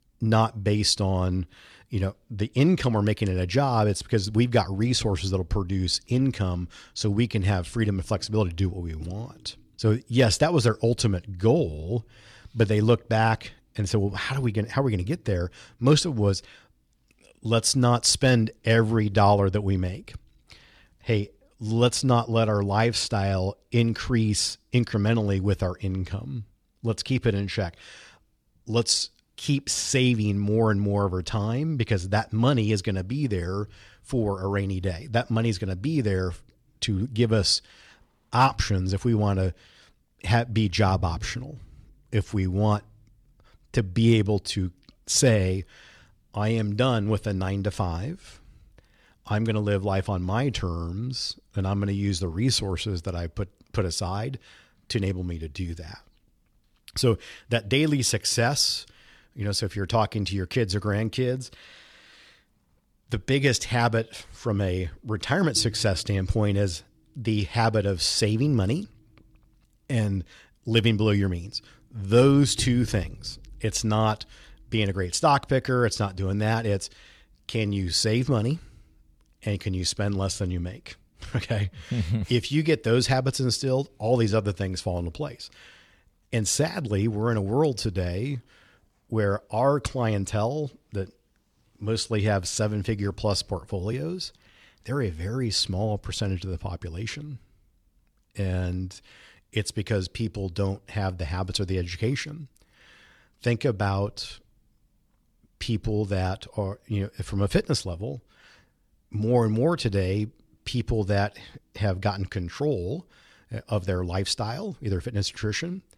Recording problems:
none

